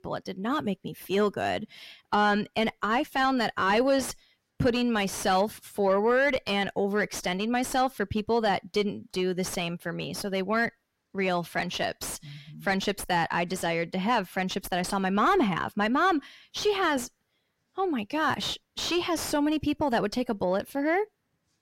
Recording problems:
distortion; slight; 9 dB below the speech

